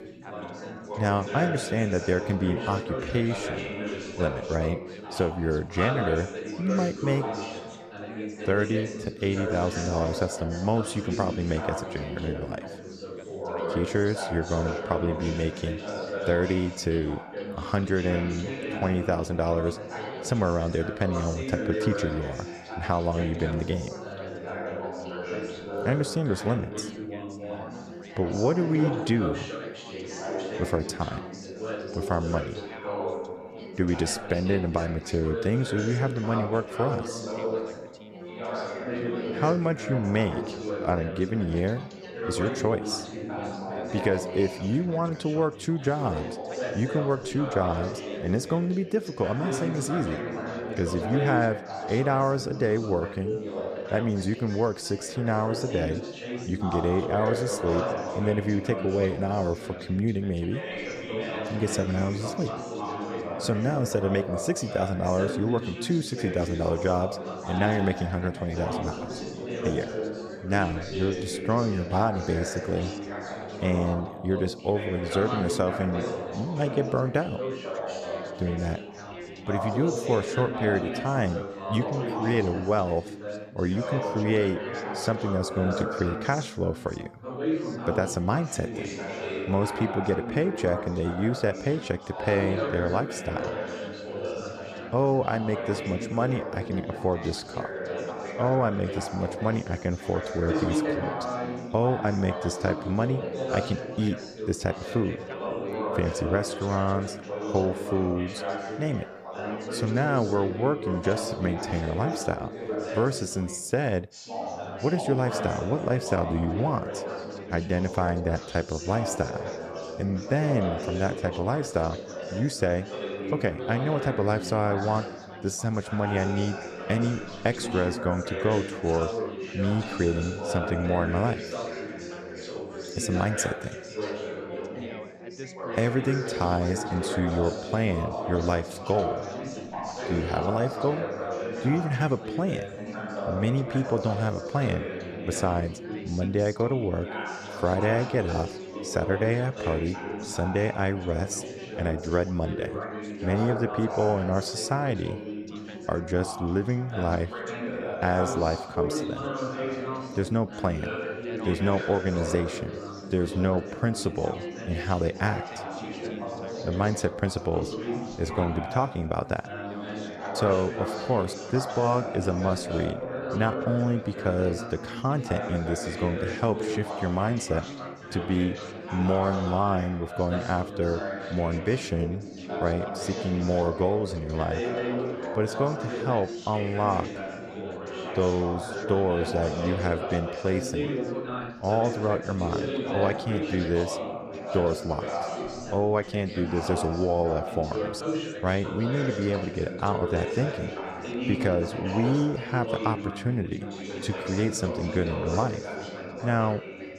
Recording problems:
background chatter; loud; throughout; 4 voices, 5 dB below the speech

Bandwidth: 14.5 kHz